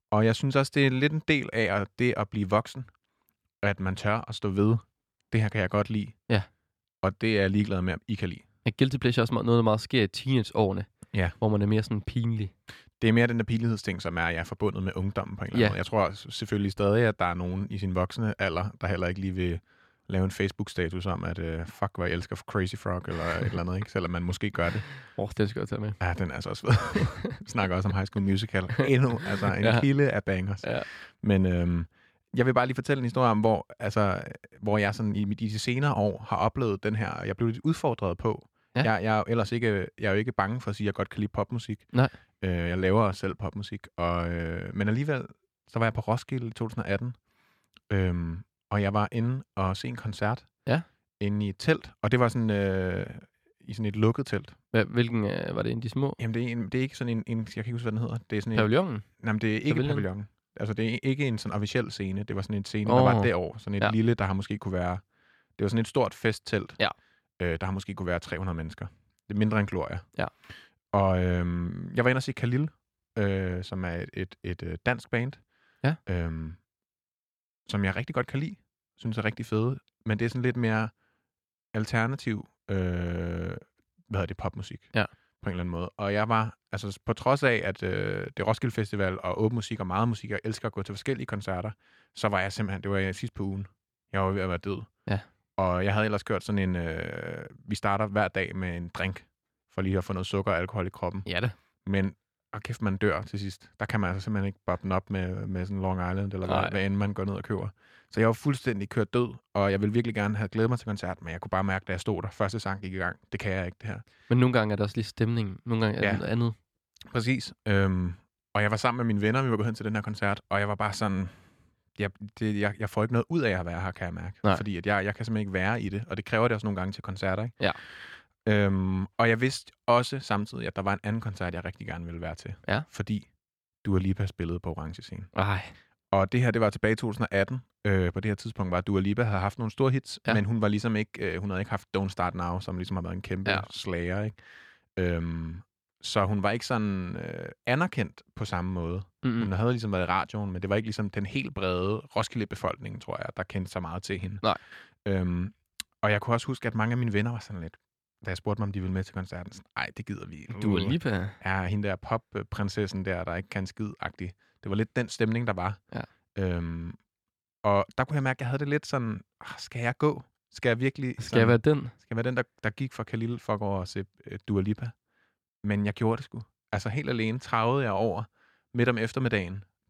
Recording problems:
none

